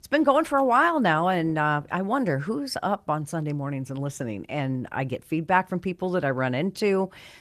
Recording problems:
garbled, watery; slightly; nothing above 14 kHz

